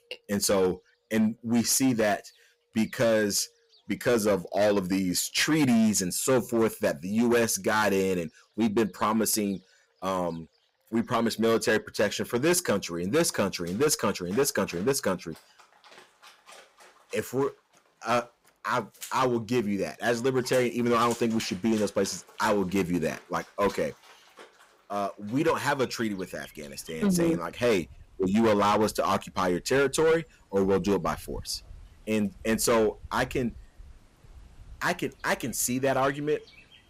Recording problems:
distortion; slight; 6% of the sound clipped
animal sounds; faint; throughout; 20 dB below the speech

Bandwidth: 15.5 kHz